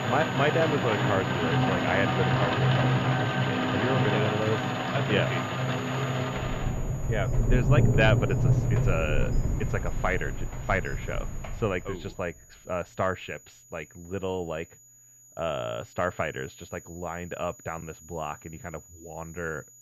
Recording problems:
muffled; slightly; fading above 3.5 kHz
rain or running water; very loud; until 12 s; 4 dB above the speech
high-pitched whine; noticeable; throughout; 7 kHz, 20 dB below the speech

